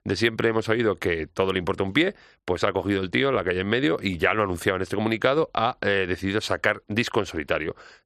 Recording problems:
none

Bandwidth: 13.5 kHz